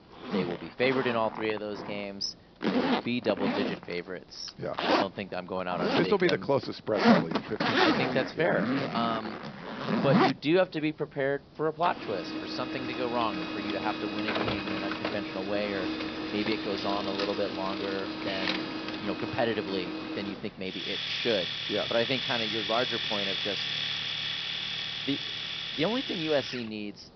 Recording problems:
high frequencies cut off; noticeable; nothing above 5.5 kHz
household noises; very loud; throughout; 1 dB above the speech
hiss; faint; throughout; 25 dB below the speech

